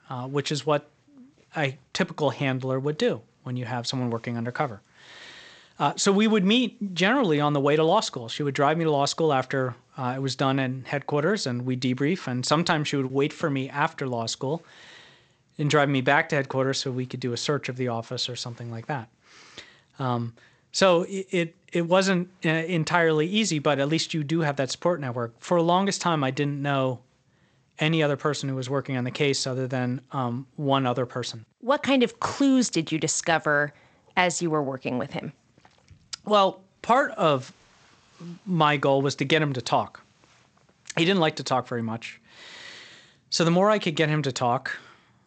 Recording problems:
garbled, watery; slightly; nothing above 8 kHz

